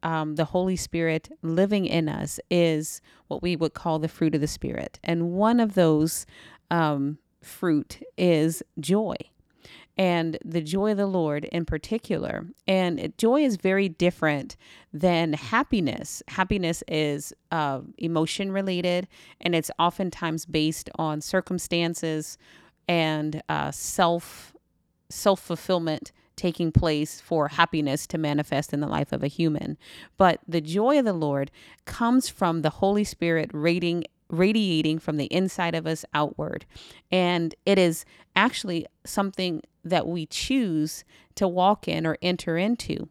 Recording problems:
none

